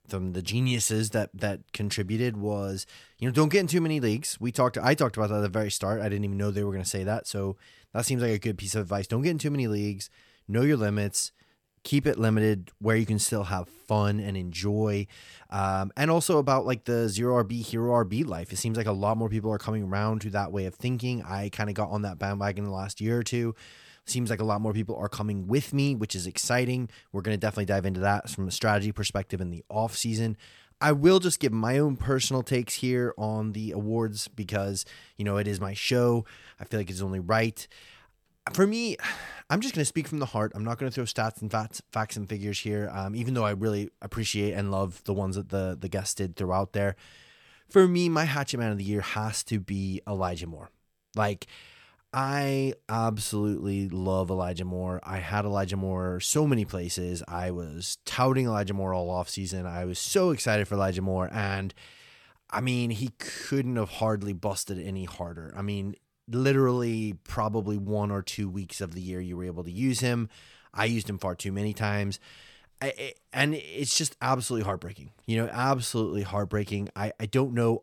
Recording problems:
none

